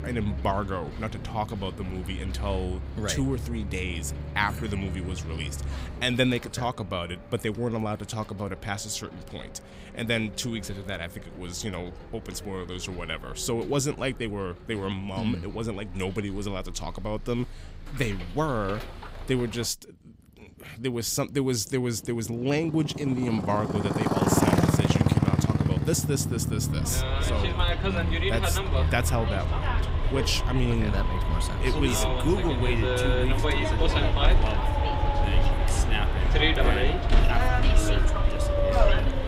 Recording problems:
traffic noise; very loud; throughout; 3 dB above the speech

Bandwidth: 15.5 kHz